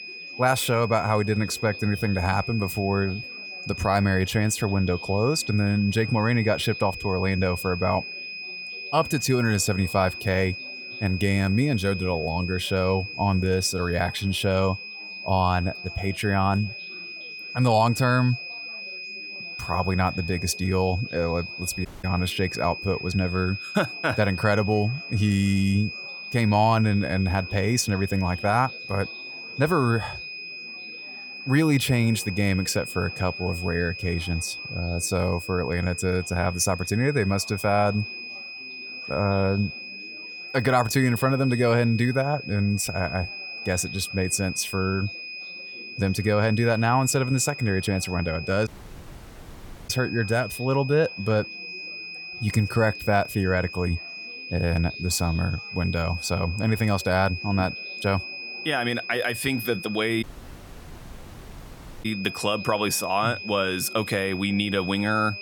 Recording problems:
high-pitched whine; loud; throughout; 2.5 kHz, 10 dB below the speech
chatter from many people; faint; throughout; 25 dB below the speech
audio cutting out; at 22 s, at 49 s for 1 s and at 1:00 for 2 s

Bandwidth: 18 kHz